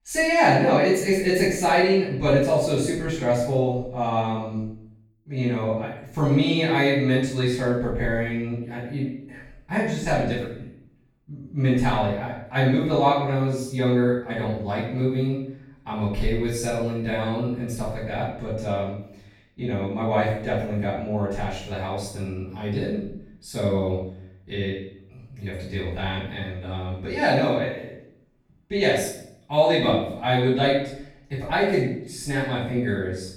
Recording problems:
off-mic speech; far
room echo; noticeable; dies away in 0.6 s

